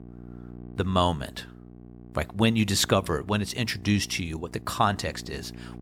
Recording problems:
electrical hum; faint; throughout; 60 Hz, 25 dB below the speech

